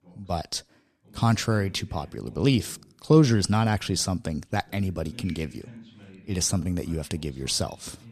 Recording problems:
voice in the background; faint; throughout; 25 dB below the speech

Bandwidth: 13.5 kHz